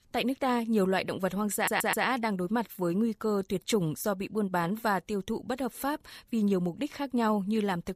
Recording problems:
audio stuttering; at 1.5 s

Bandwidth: 15 kHz